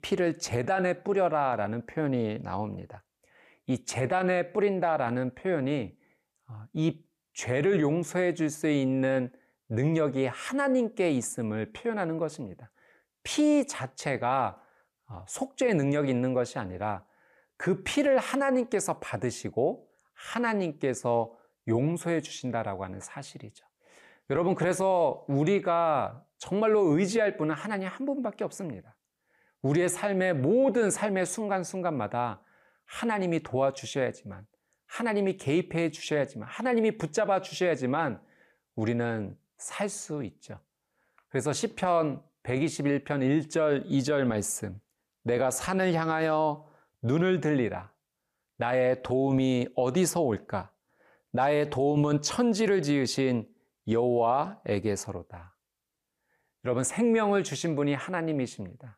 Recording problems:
none

